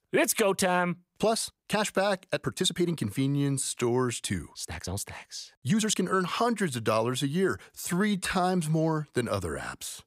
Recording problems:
uneven, jittery; strongly; from 1 to 8.5 s

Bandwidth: 15.5 kHz